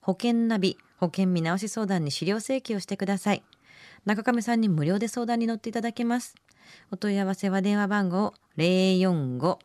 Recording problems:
none

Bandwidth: 14.5 kHz